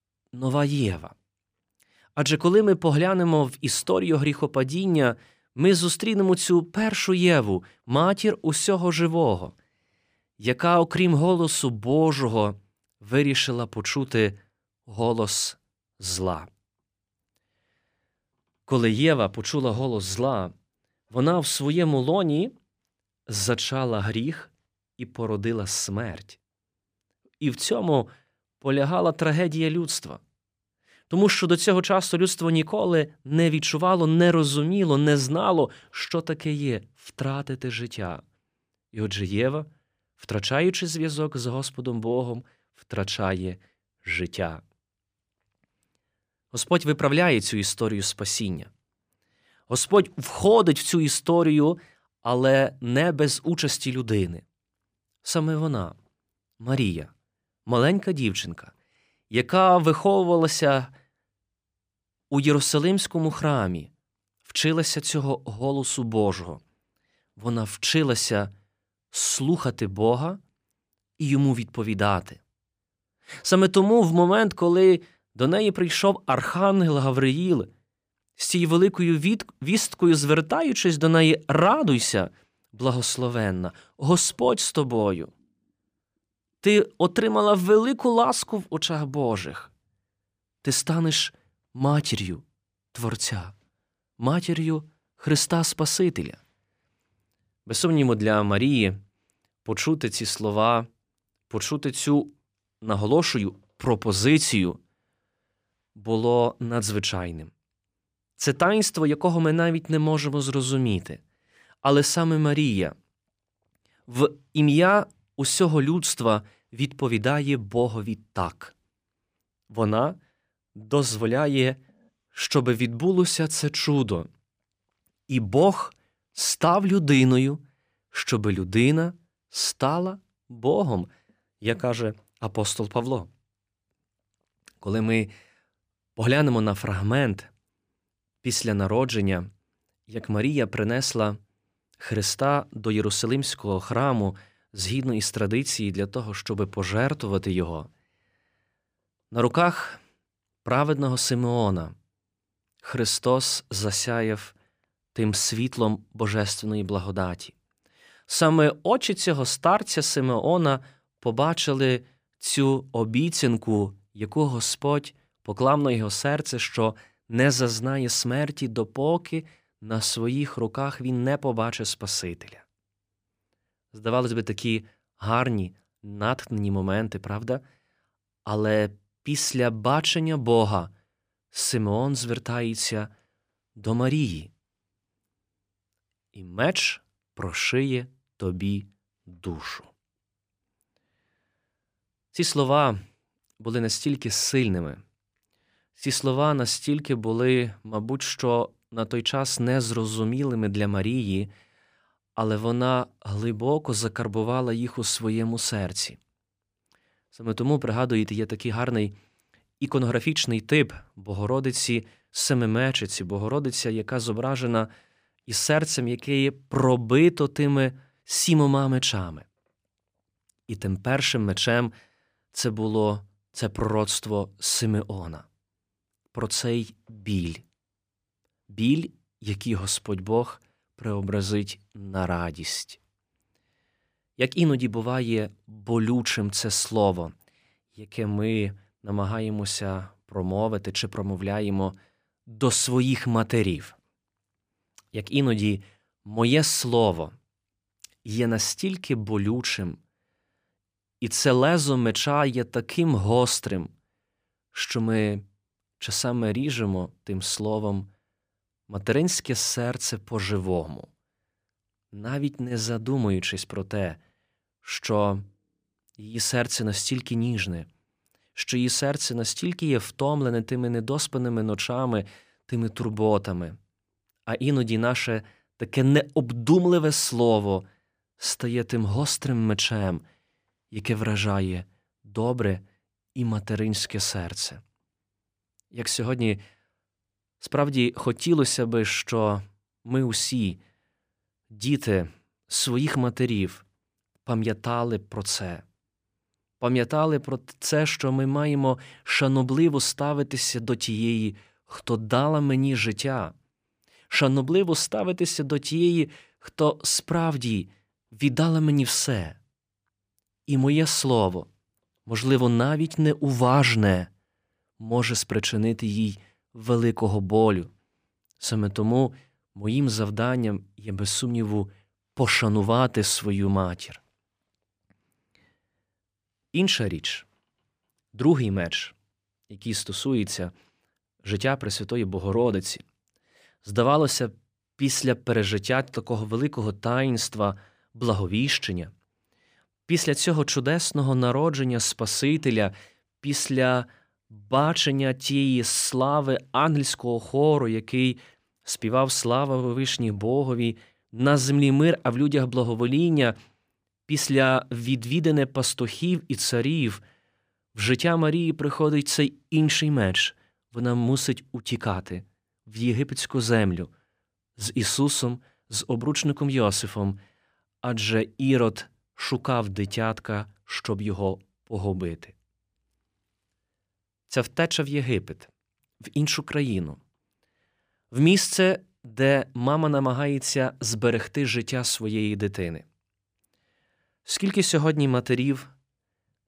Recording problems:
none

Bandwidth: 15 kHz